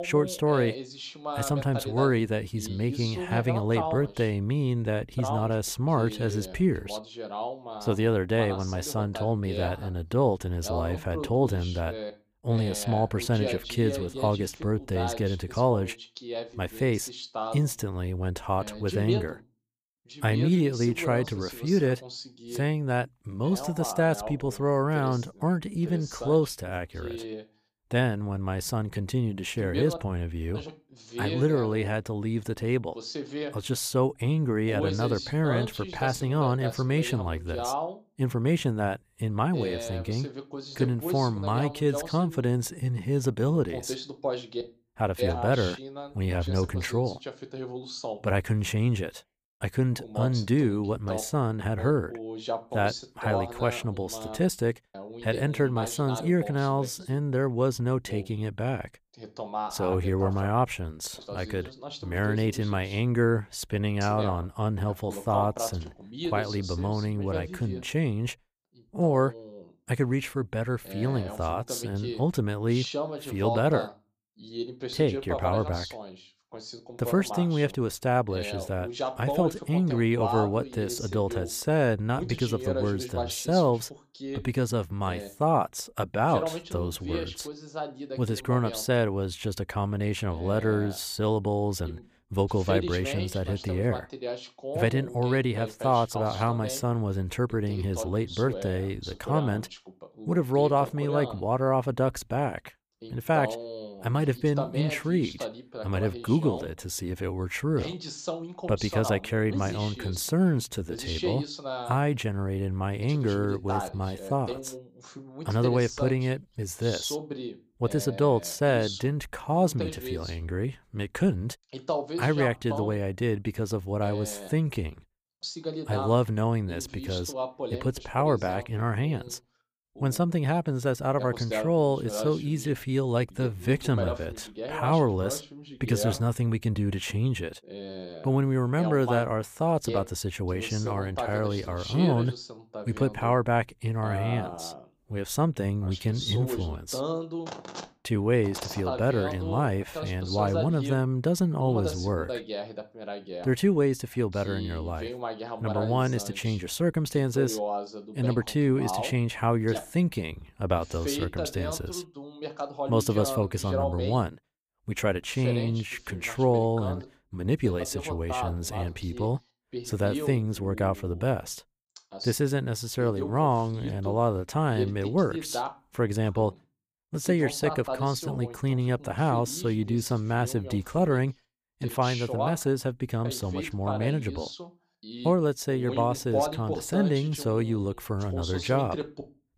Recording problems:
voice in the background; loud; throughout; 9 dB below the speech

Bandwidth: 15 kHz